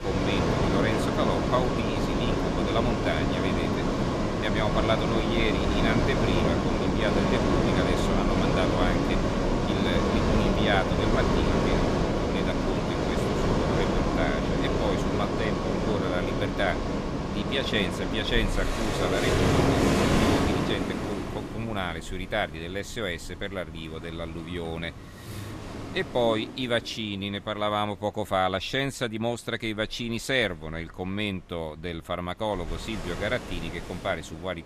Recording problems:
rain or running water; very loud; throughout; 4 dB above the speech

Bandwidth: 14.5 kHz